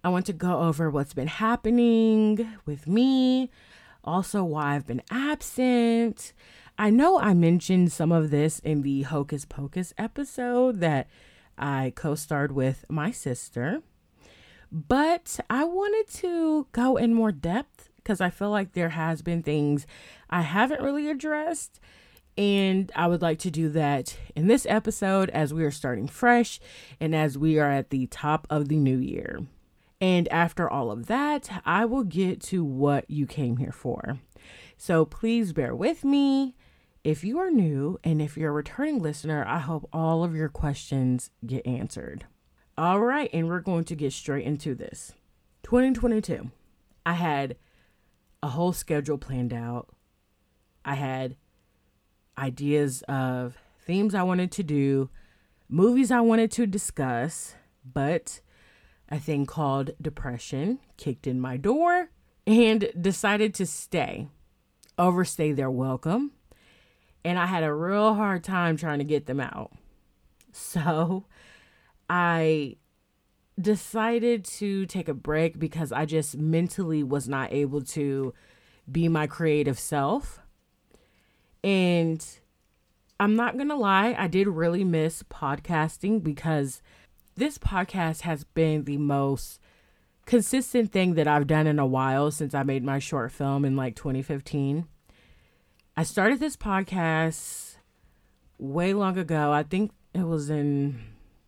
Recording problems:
none

